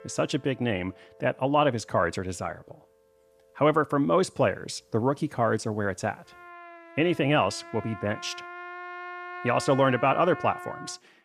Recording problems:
background music; noticeable; throughout; 15 dB below the speech

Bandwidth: 14.5 kHz